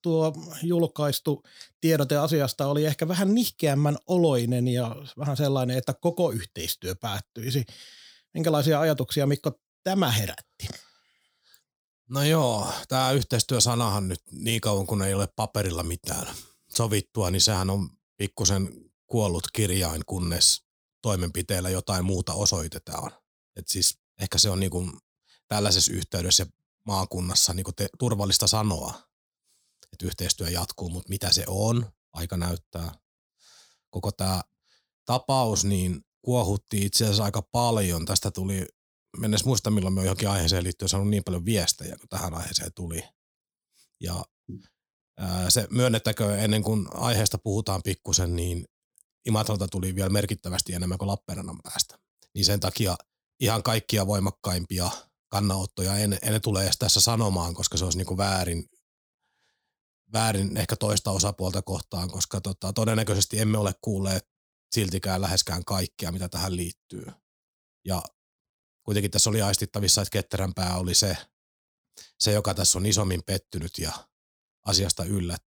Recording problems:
none

